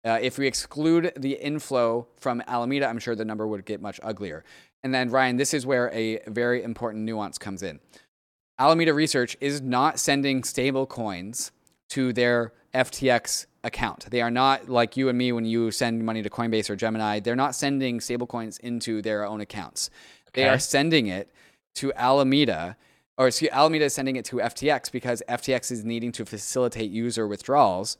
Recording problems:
none

